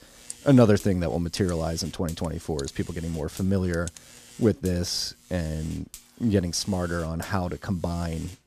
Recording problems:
electrical hum; noticeable; throughout; 60 Hz, 20 dB below the speech

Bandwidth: 14.5 kHz